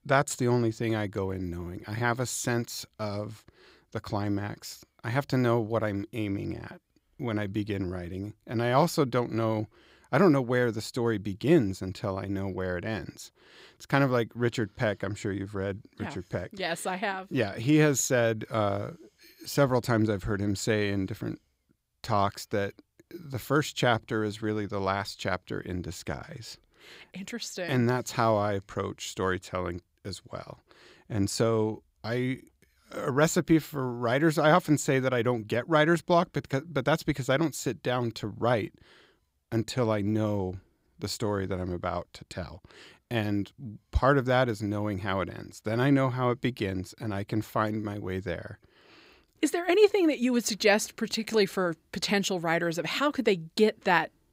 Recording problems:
none

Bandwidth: 15.5 kHz